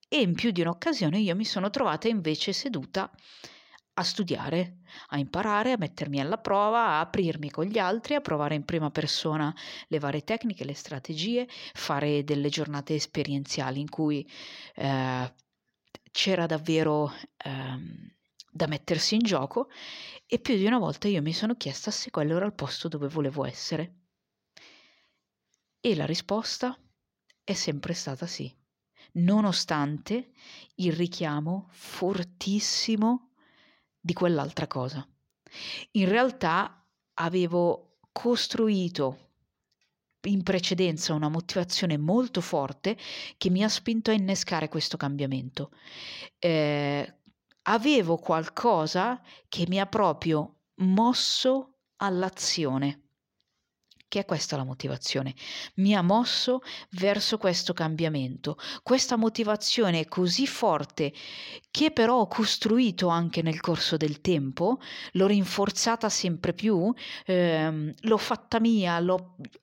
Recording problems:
none

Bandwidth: 16 kHz